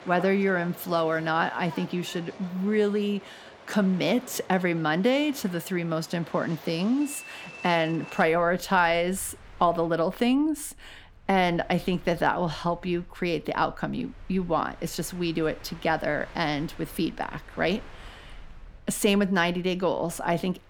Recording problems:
train or aircraft noise; noticeable; throughout; 20 dB below the speech

